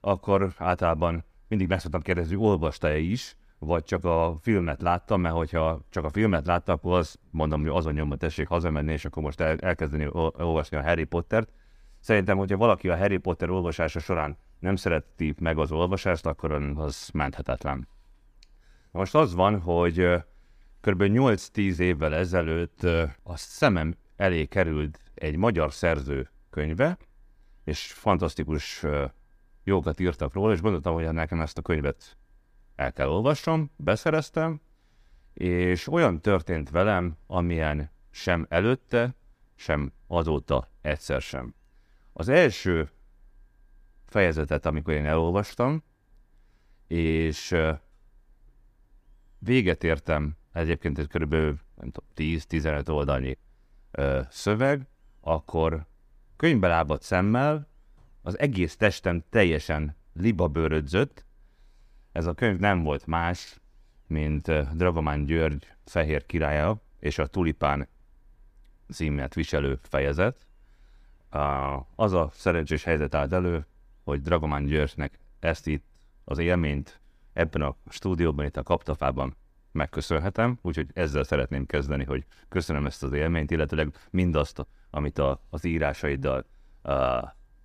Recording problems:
none

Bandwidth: 15 kHz